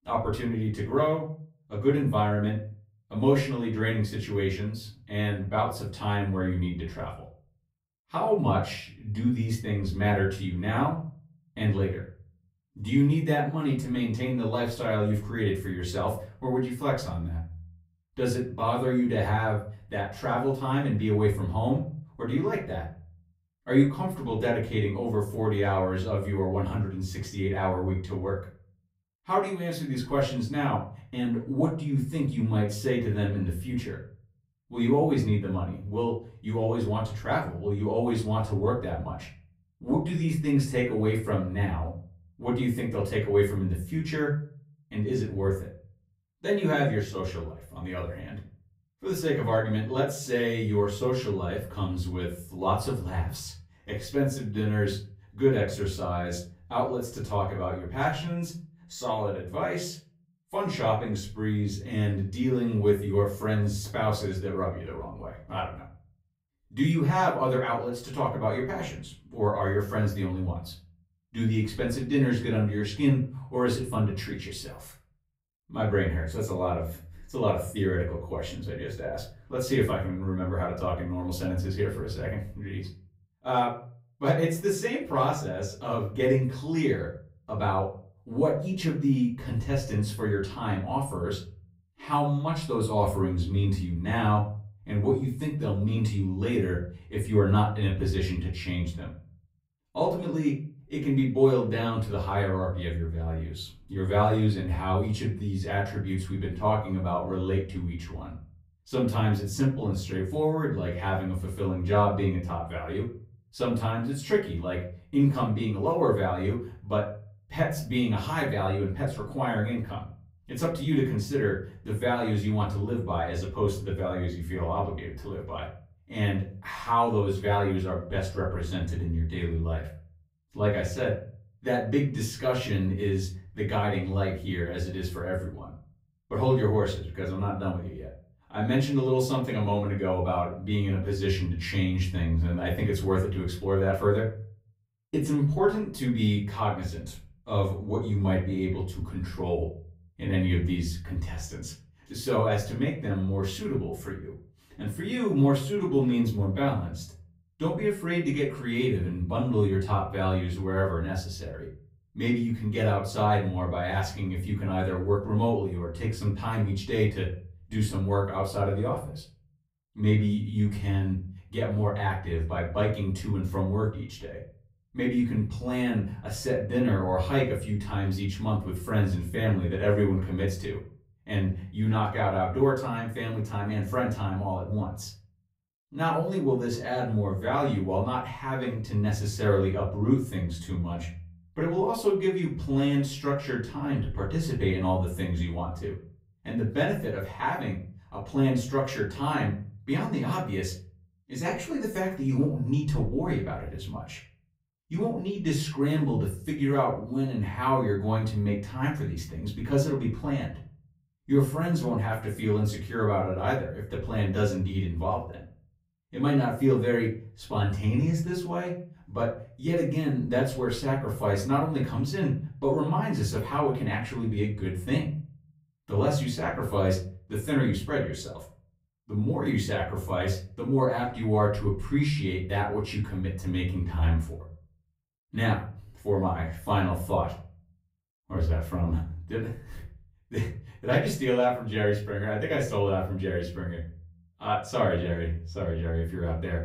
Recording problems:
off-mic speech; far
room echo; slight; dies away in 0.4 s

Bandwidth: 15.5 kHz